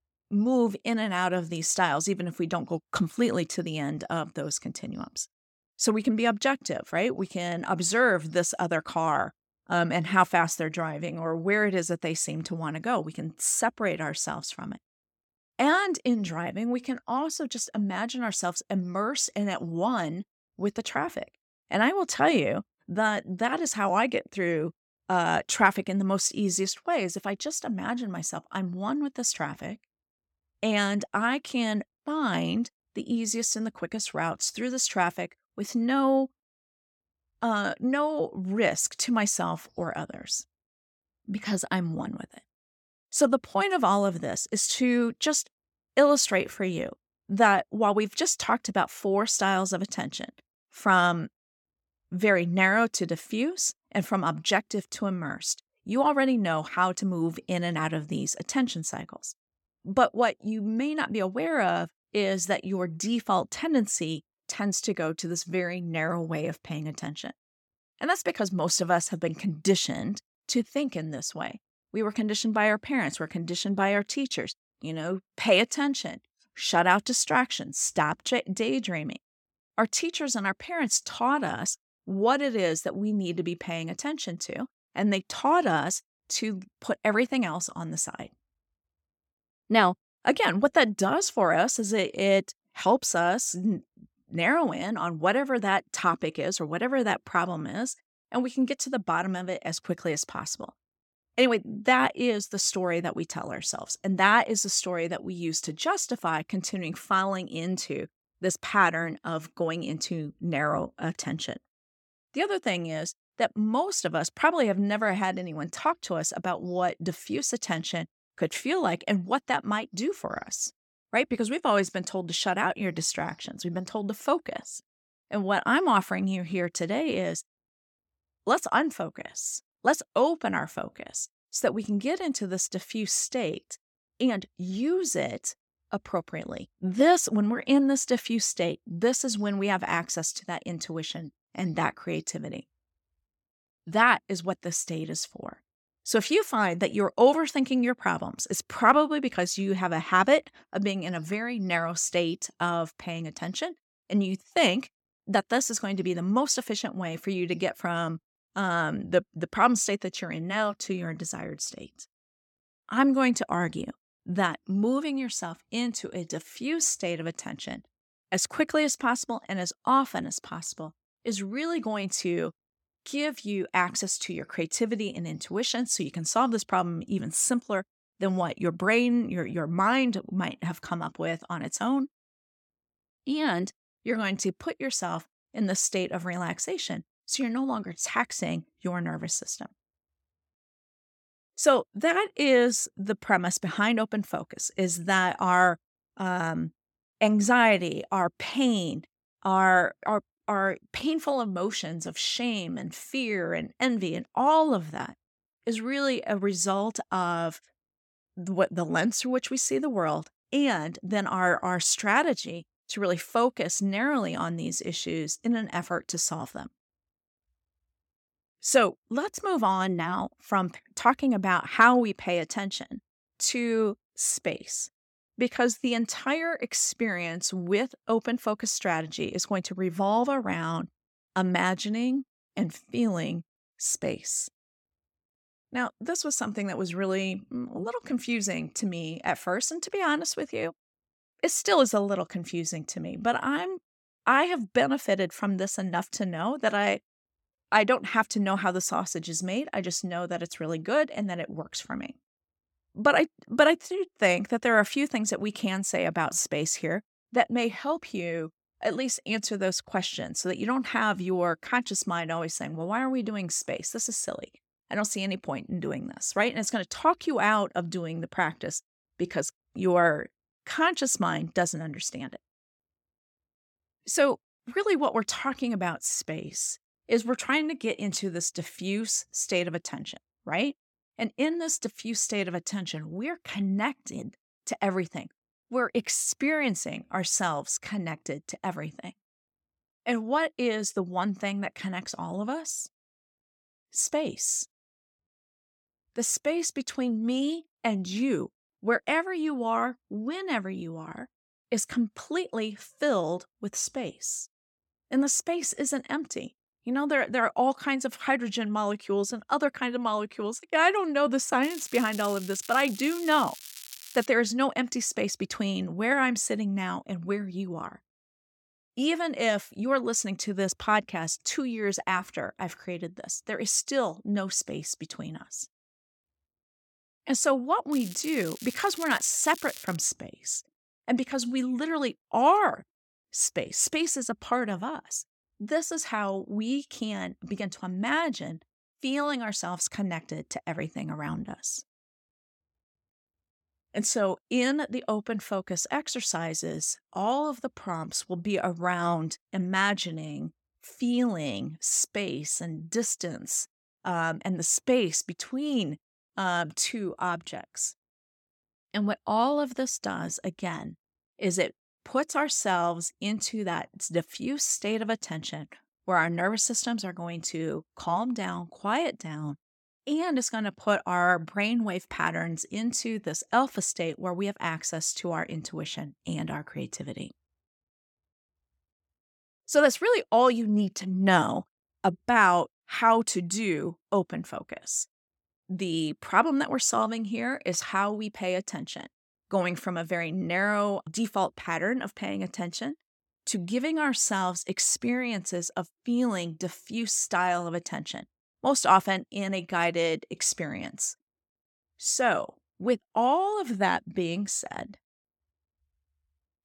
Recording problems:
crackling; noticeable; from 5:12 to 5:14 and from 5:28 to 5:30; 15 dB below the speech

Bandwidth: 17.5 kHz